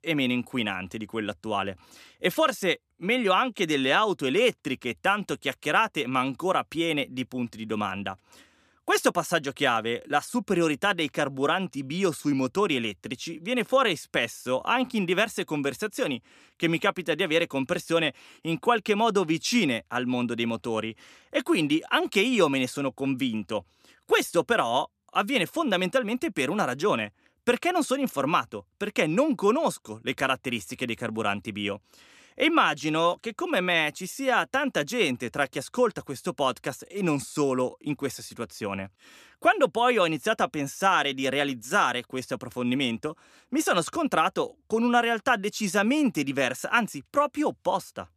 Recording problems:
none

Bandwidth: 14.5 kHz